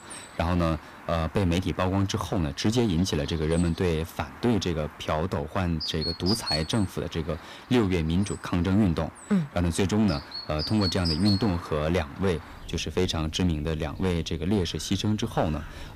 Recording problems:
distortion; slight; 4% of the sound clipped
animal sounds; noticeable; throughout; 10 dB below the speech

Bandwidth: 15 kHz